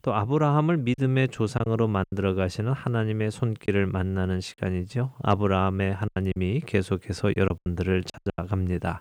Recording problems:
choppy; very; 7% of the speech affected

